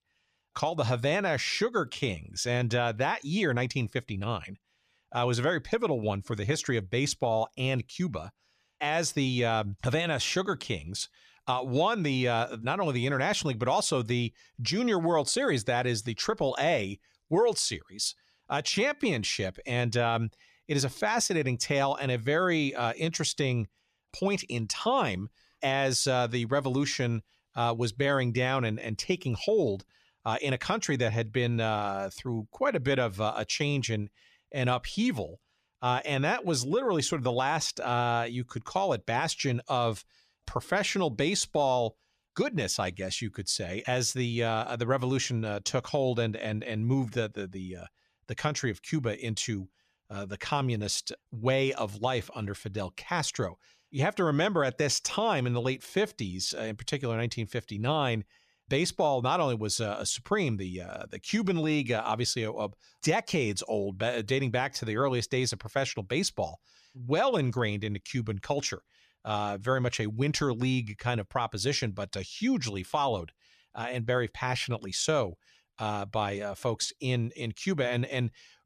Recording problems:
none

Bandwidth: 14.5 kHz